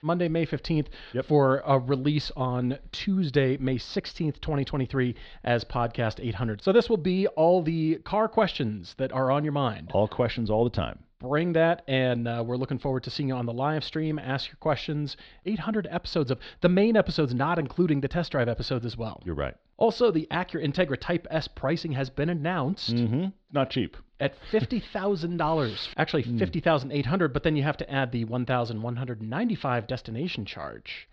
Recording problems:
muffled; very slightly; fading above 4 kHz

